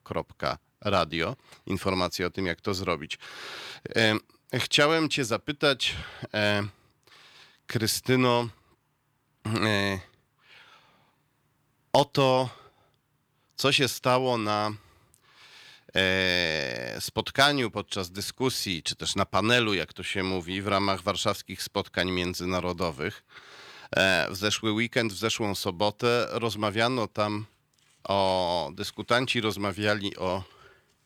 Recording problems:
none

